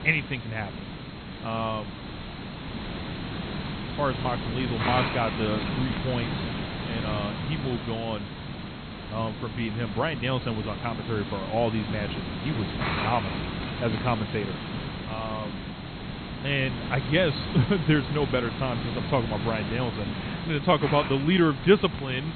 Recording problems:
high frequencies cut off; severe; nothing above 4 kHz
hiss; loud; throughout; 5 dB below the speech

